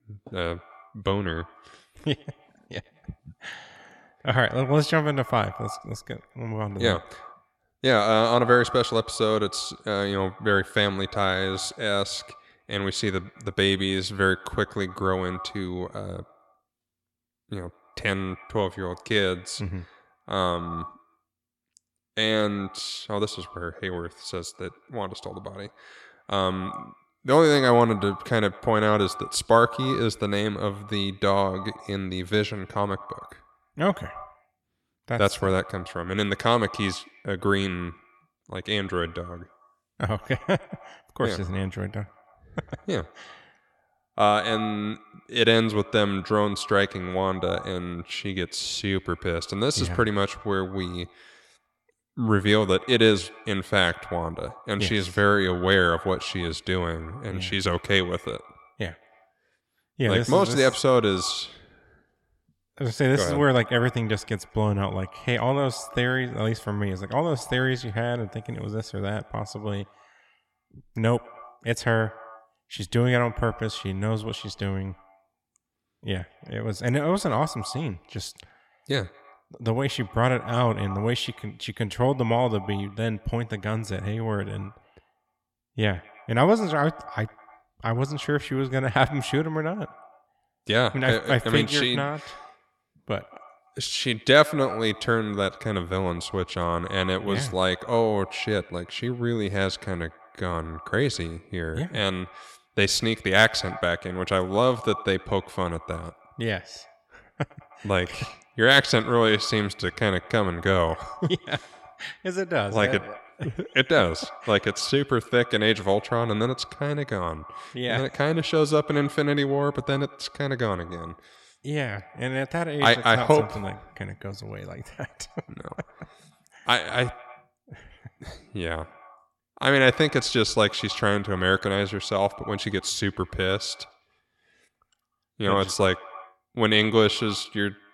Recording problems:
echo of what is said; faint; throughout; 100 ms later, 20 dB below the speech

